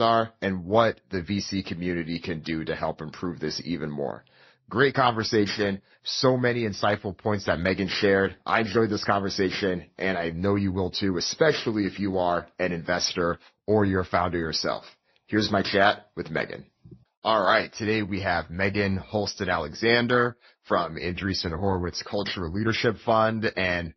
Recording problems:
garbled, watery; slightly; nothing above 6 kHz
abrupt cut into speech; at the start

